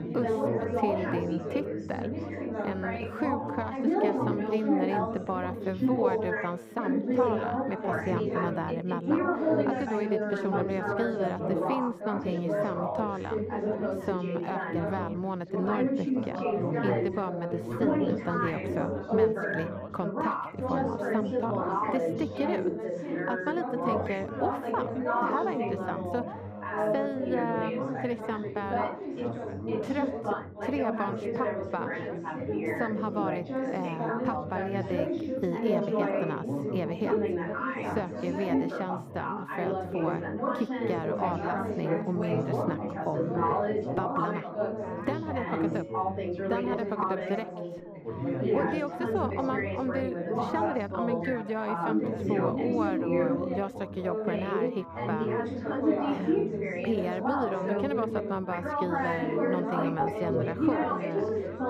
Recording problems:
muffled; very; fading above 3 kHz
chatter from many people; very loud; throughout; 3 dB above the speech

